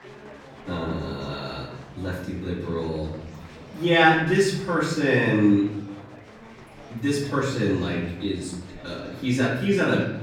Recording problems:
off-mic speech; far
room echo; noticeable; dies away in 0.9 s
murmuring crowd; faint; throughout; 20 dB below the speech

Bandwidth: 19 kHz